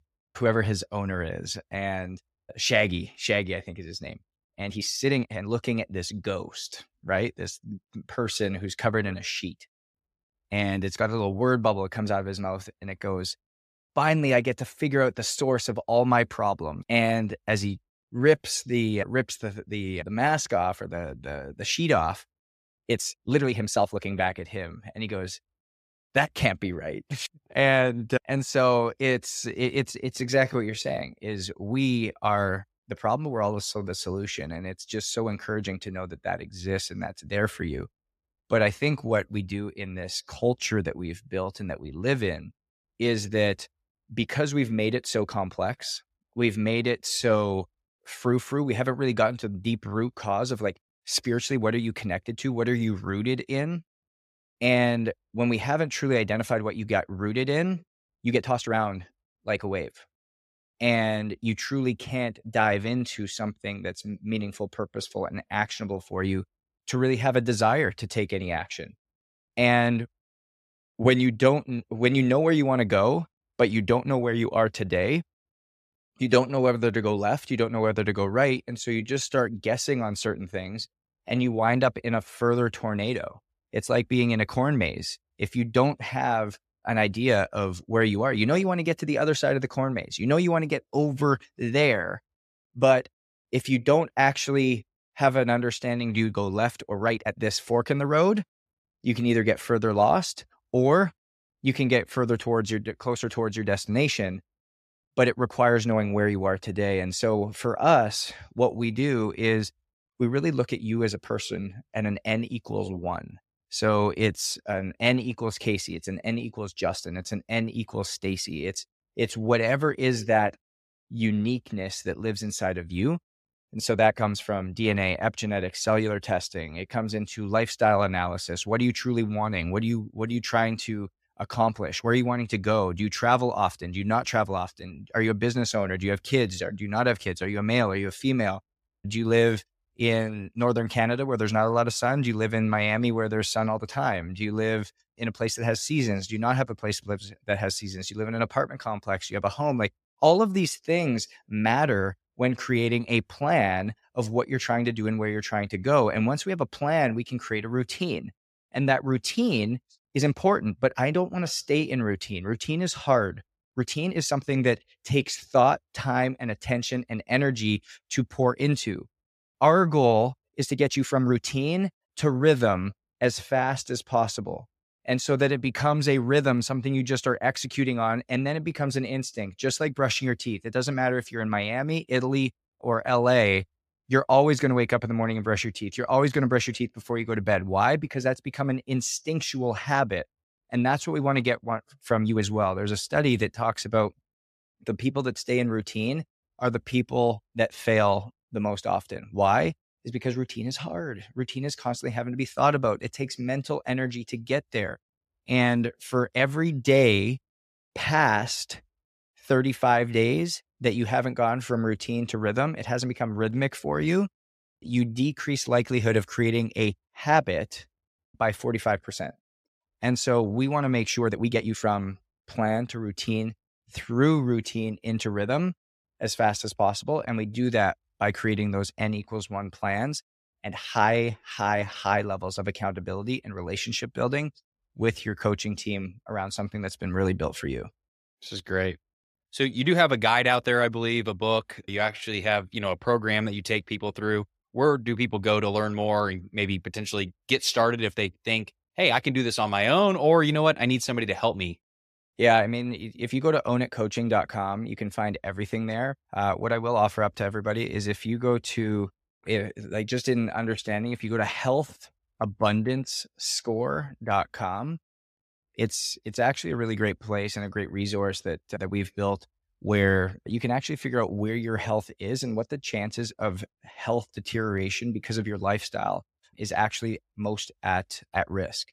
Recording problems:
uneven, jittery; strongly; from 4.5 s to 3:55

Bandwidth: 14.5 kHz